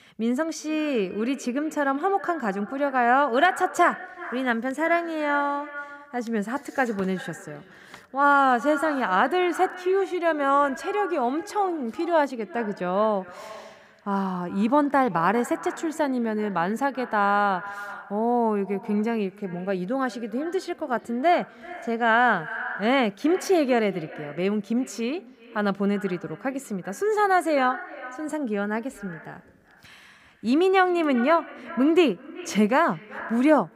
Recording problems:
echo of what is said; noticeable; throughout; 380 ms later, 15 dB below the speech

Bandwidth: 15.5 kHz